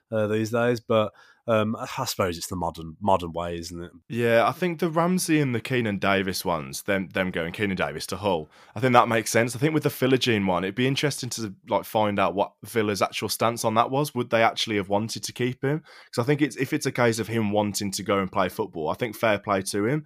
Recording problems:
none

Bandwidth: 15 kHz